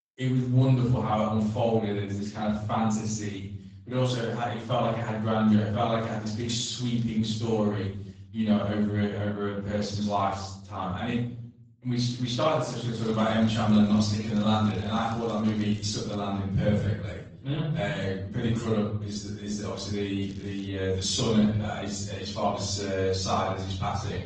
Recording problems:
off-mic speech; far
room echo; noticeable; dies away in 0.6 s
garbled, watery; slightly
crackling; faint; from 6 to 7 s, from 12 to 16 s and at 20 s; 25 dB below the speech

